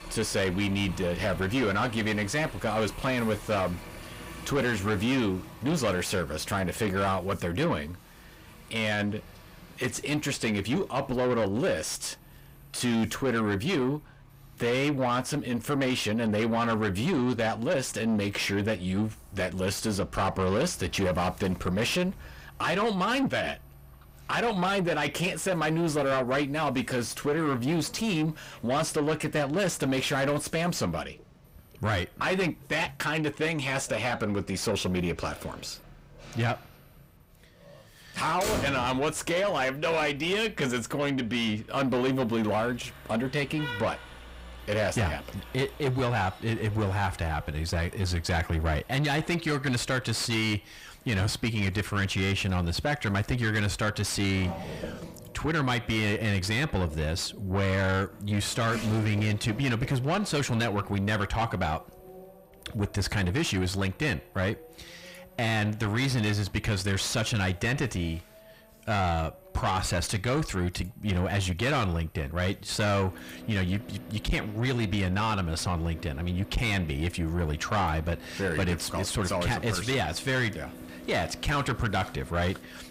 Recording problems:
distortion; heavy; 8 dB below the speech
traffic noise; noticeable; throughout; 15 dB below the speech

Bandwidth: 15.5 kHz